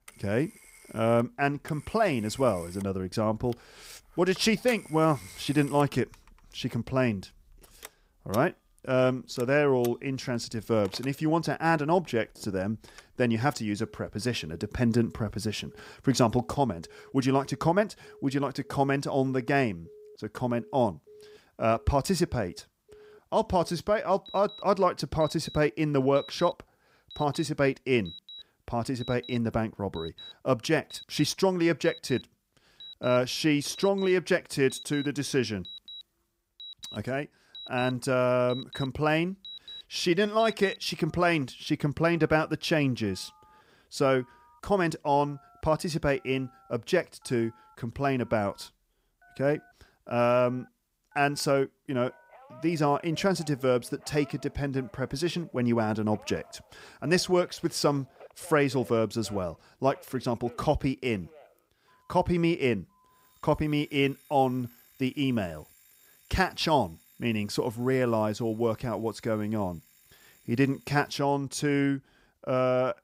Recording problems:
alarms or sirens; faint; throughout; 20 dB below the speech

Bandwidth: 15.5 kHz